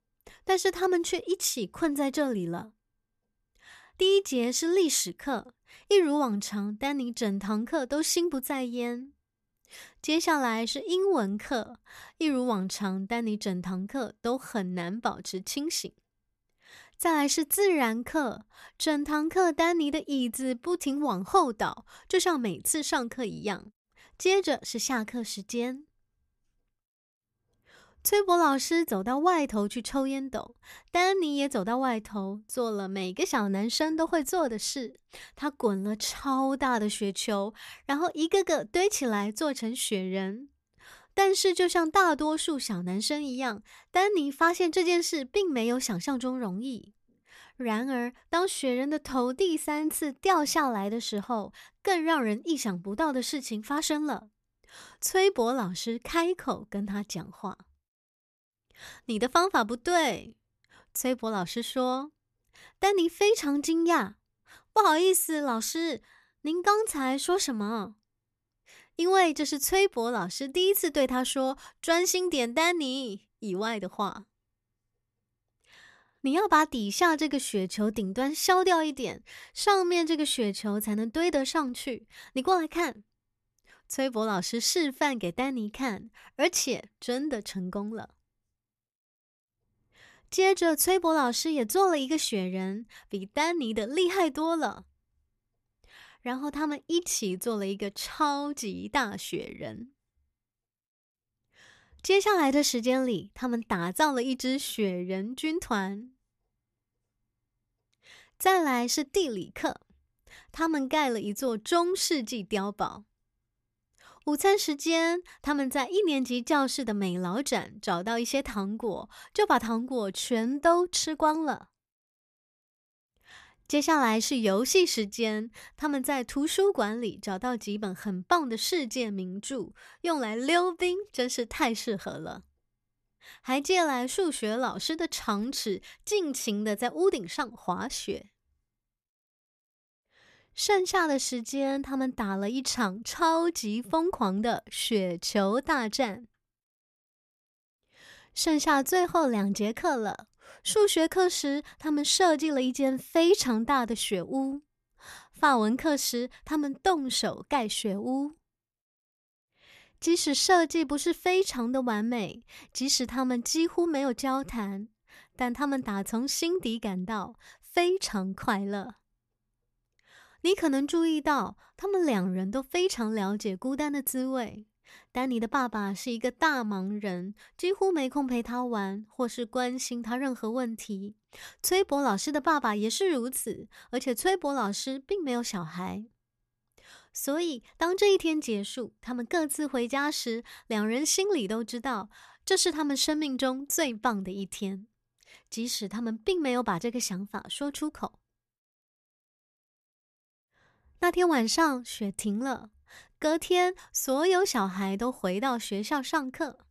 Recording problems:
none

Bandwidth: 13.5 kHz